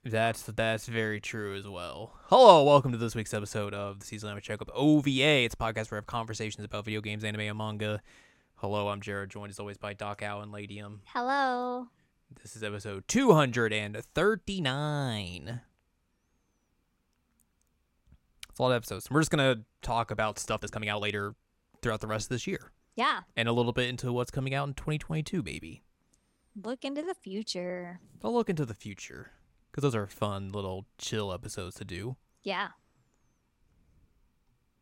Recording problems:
uneven, jittery; strongly; from 0.5 to 30 s

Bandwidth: 16.5 kHz